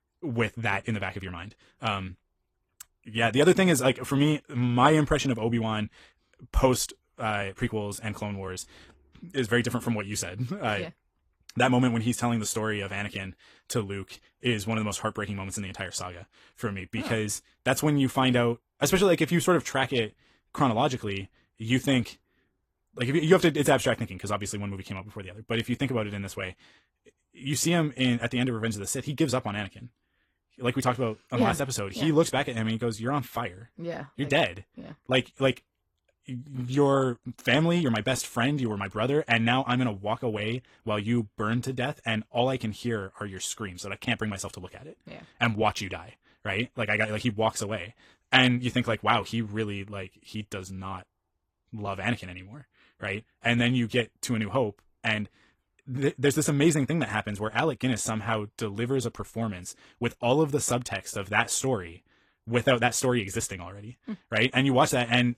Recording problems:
wrong speed, natural pitch; too fast; 1.5 times normal speed
garbled, watery; slightly

